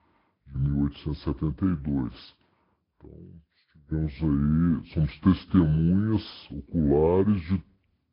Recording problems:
wrong speed and pitch; too slow and too low; 0.7 times normal speed
high frequencies cut off; noticeable; nothing above 5 kHz
garbled, watery; slightly

